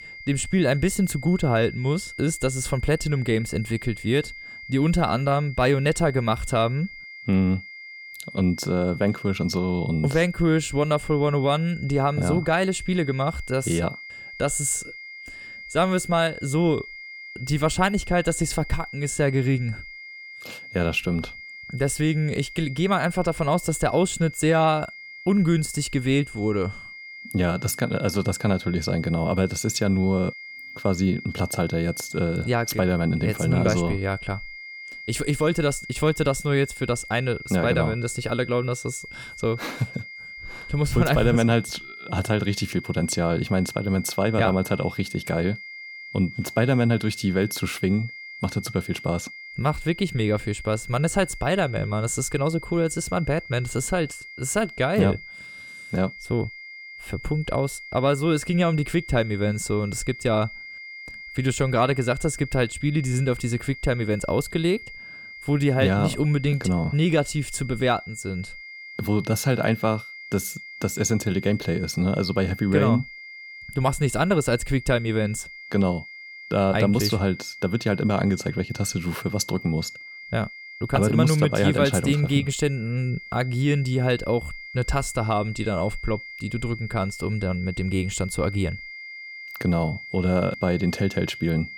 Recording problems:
high-pitched whine; noticeable; throughout; 2 kHz, 15 dB below the speech

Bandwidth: 18 kHz